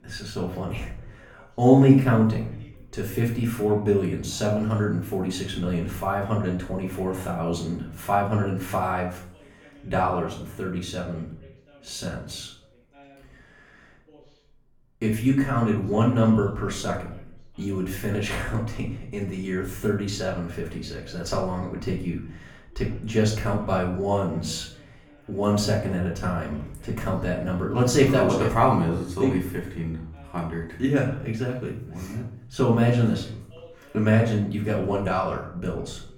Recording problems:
off-mic speech; far
room echo; slight; dies away in 0.5 s
voice in the background; faint; throughout; 30 dB below the speech

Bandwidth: 18 kHz